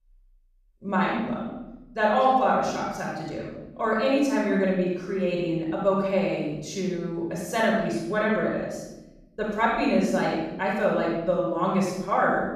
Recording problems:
room echo; strong; dies away in 0.9 s
off-mic speech; far

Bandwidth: 14.5 kHz